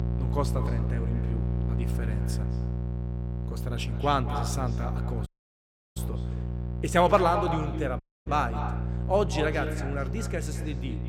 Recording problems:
echo of what is said; strong; throughout; 210 ms later, 8 dB below the speech
electrical hum; noticeable; throughout; 60 Hz, 15 dB below the speech
audio cutting out; at 5.5 s for 0.5 s and at 8 s

